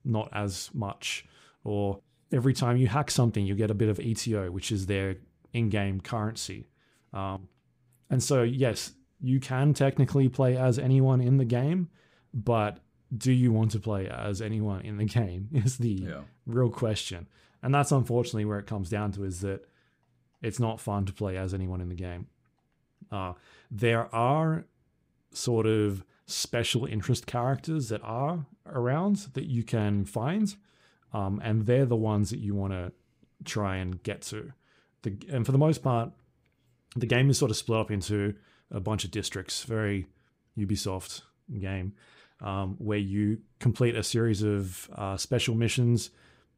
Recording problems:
none

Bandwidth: 15.5 kHz